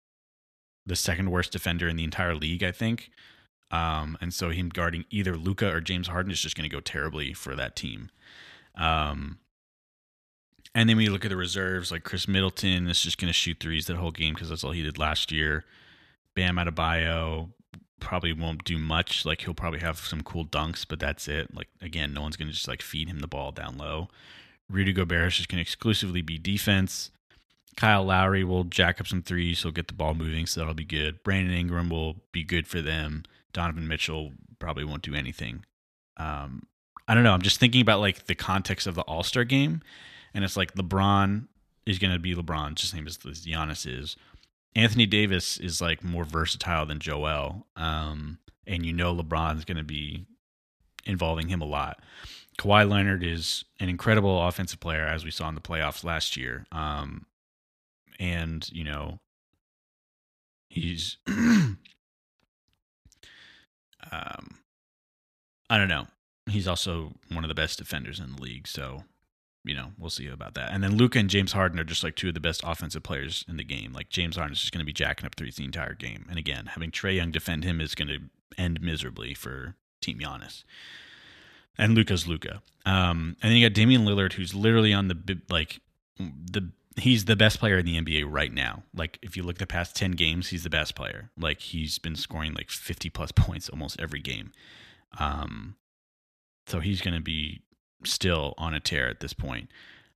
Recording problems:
none

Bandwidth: 14.5 kHz